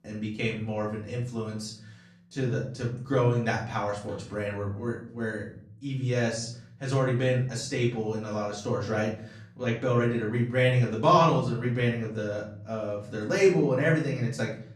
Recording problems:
off-mic speech; far
room echo; slight; dies away in 0.5 s

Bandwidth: 14.5 kHz